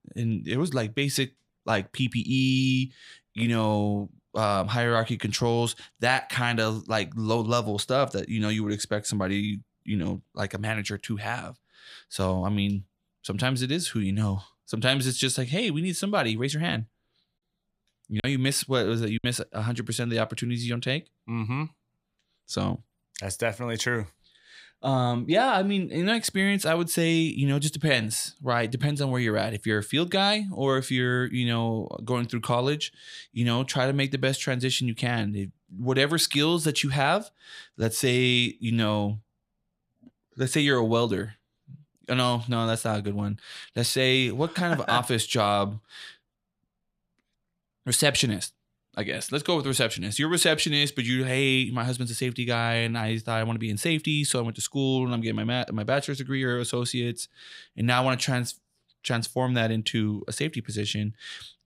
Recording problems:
choppy; occasionally; from 18 to 19 s; 3% of the speech affected

